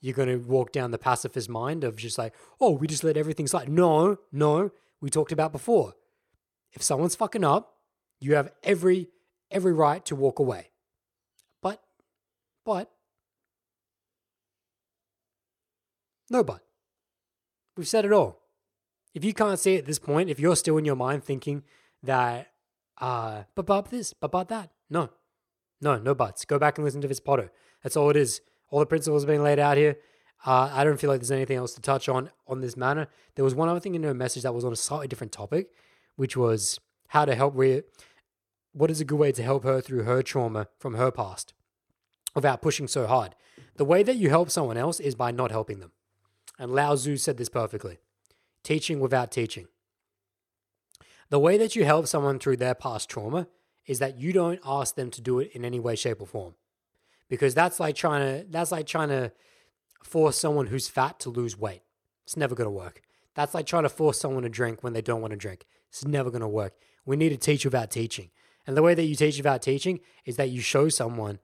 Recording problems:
none

